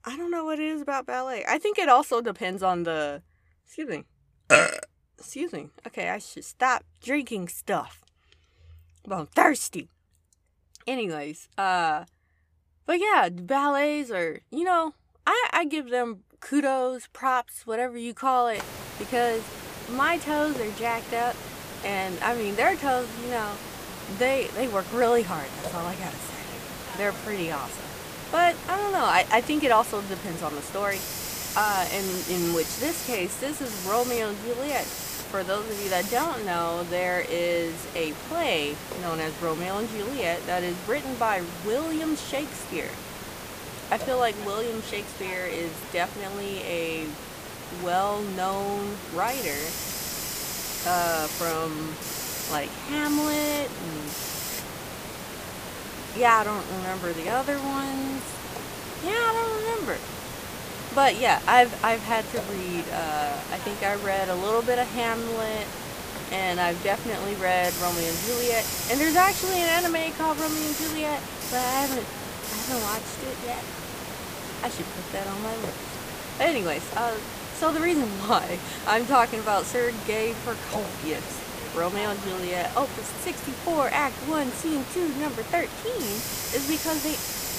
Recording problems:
hiss; loud; from 19 s on; 7 dB below the speech

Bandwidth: 15 kHz